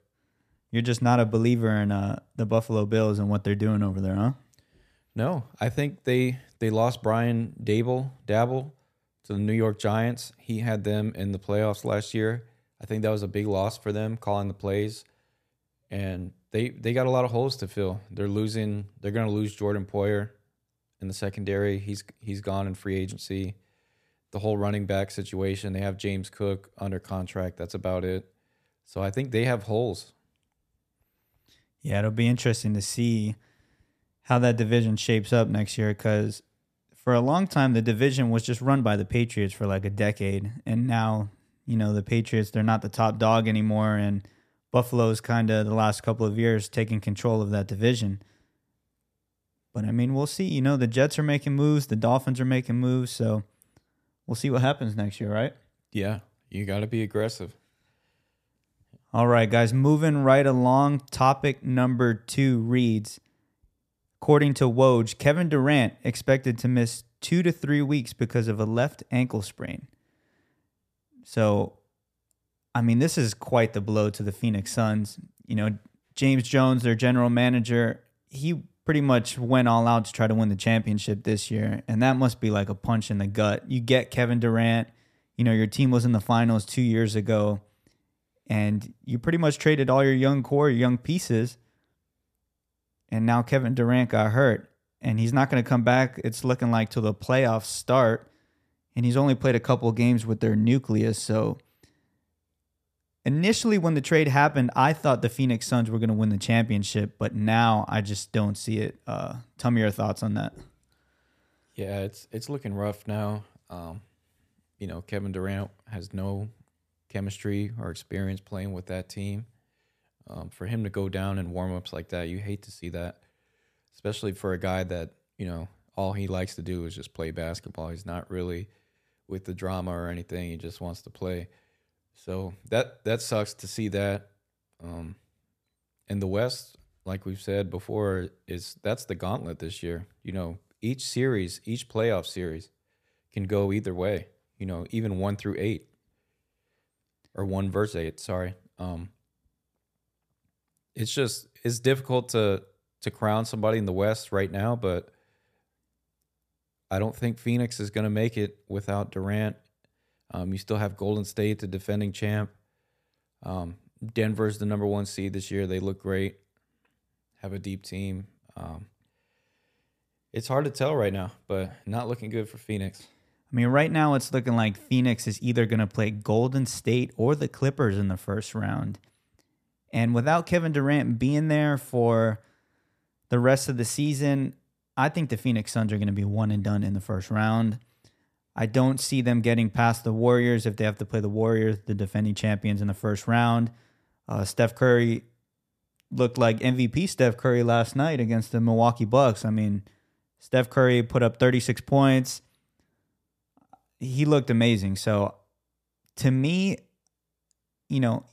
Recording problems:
none

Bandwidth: 14.5 kHz